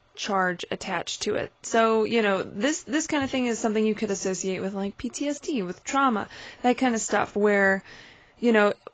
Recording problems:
garbled, watery; badly; nothing above 7.5 kHz

